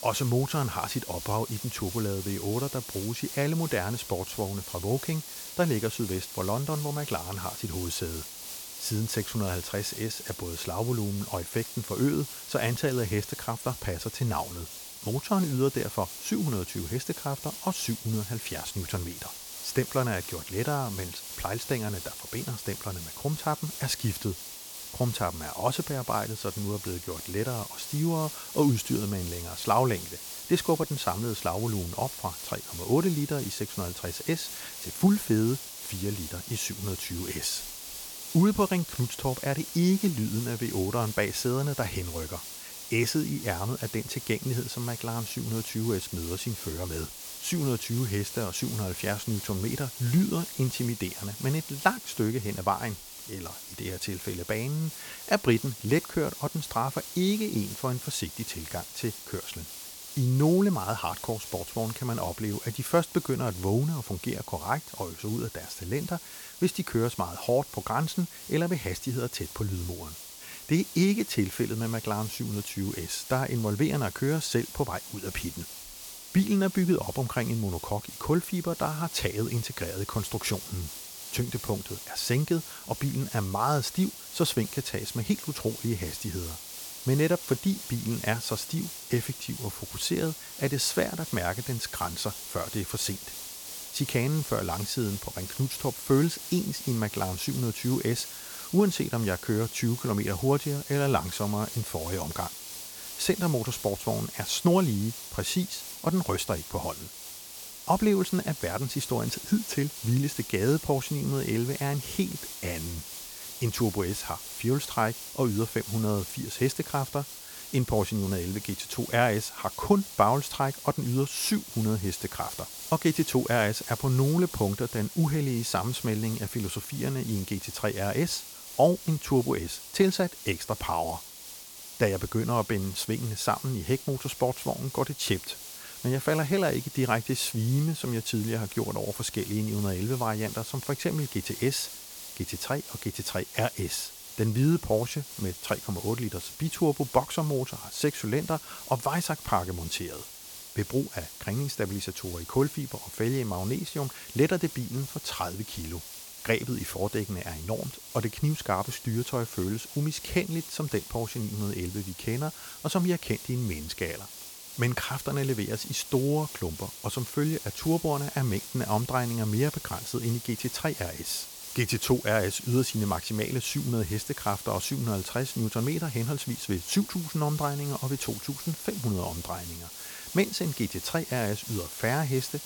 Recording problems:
hiss; loud; throughout; 9 dB below the speech

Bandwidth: 18 kHz